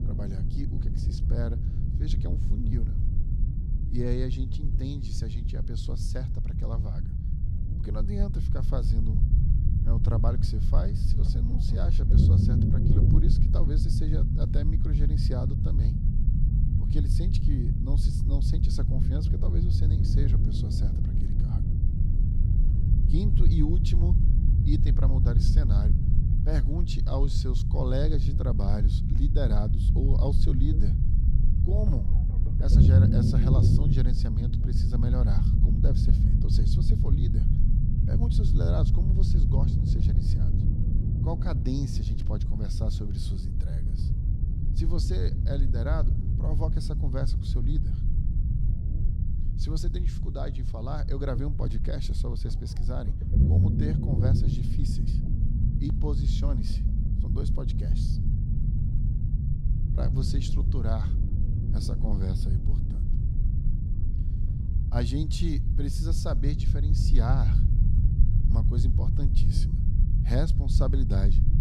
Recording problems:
low rumble; loud; throughout; 1 dB below the speech

